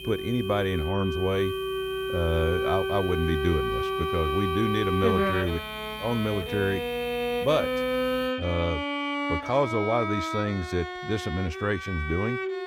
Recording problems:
background music; loud; throughout; 2 dB below the speech
high-pitched whine; noticeable; until 9 s; 3 kHz, 10 dB below the speech
electrical hum; faint; until 8.5 s; 60 Hz, 25 dB below the speech

